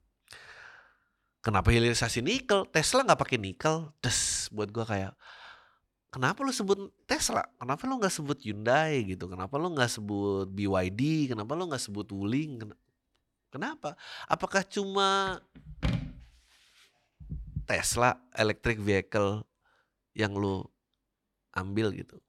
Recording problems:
none

